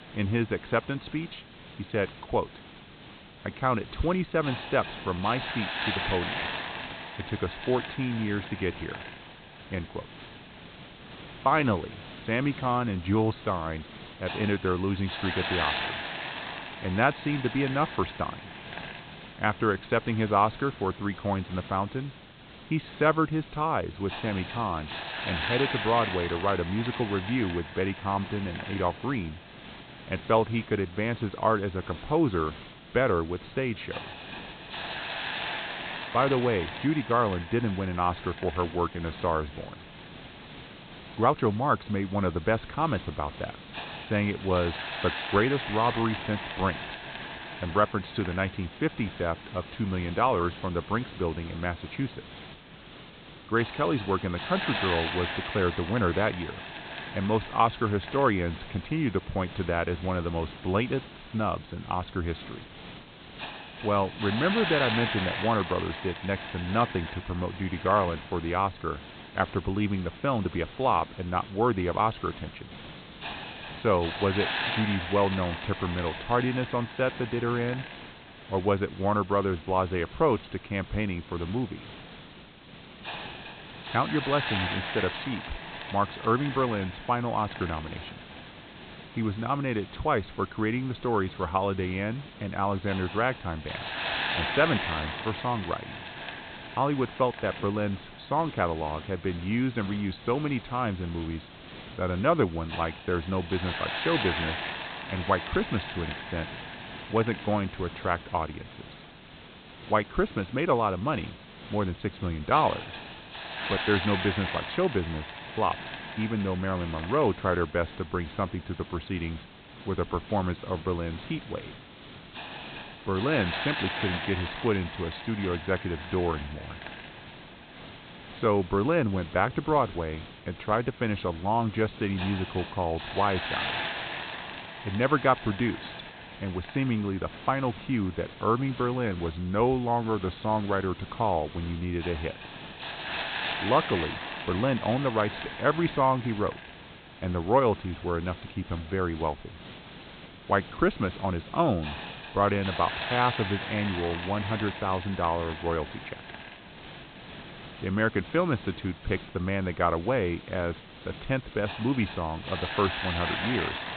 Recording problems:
high frequencies cut off; severe; nothing above 4 kHz
hiss; loud; throughout; 9 dB below the speech

